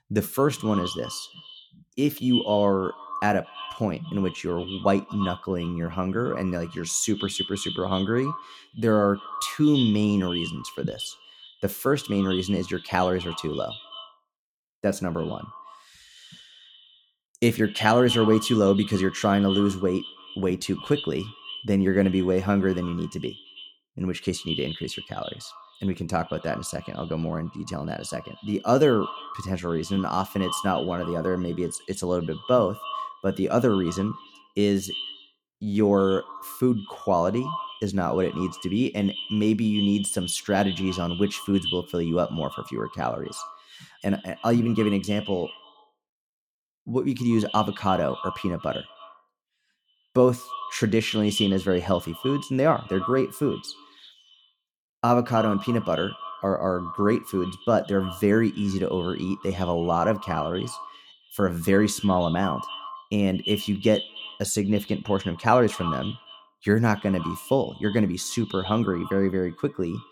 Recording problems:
echo of what is said; strong; throughout; 110 ms later, 10 dB below the speech

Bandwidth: 18.5 kHz